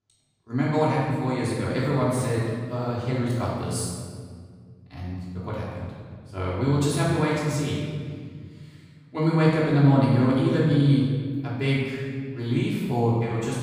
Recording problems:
room echo; strong; dies away in 1.8 s
off-mic speech; far

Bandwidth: 15 kHz